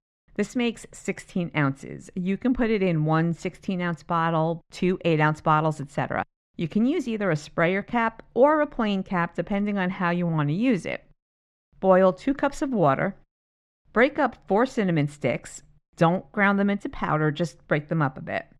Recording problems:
muffled; very; fading above 3 kHz

